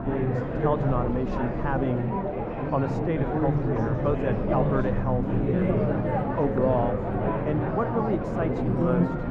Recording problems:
muffled; very; fading above 2.5 kHz
chatter from many people; very loud; throughout; 2 dB above the speech
low rumble; noticeable; throughout; 15 dB below the speech

